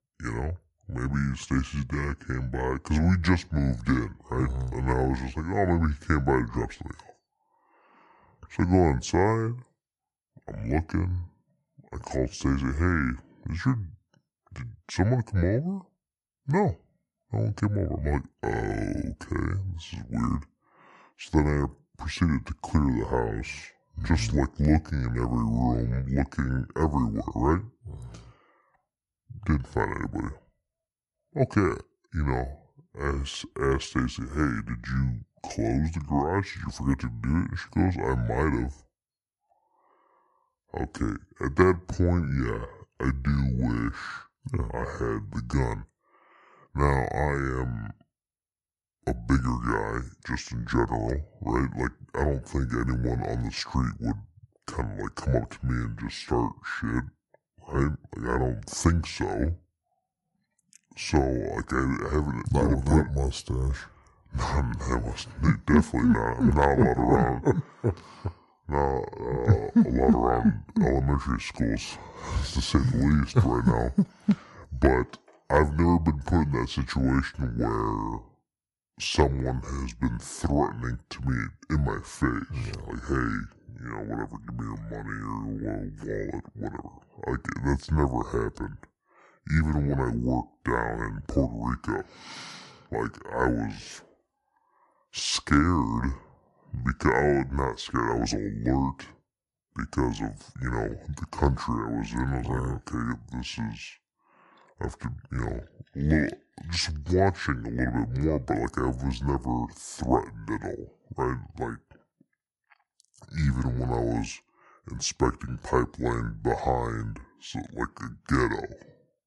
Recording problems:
wrong speed and pitch; too slow and too low; 0.7 times normal speed

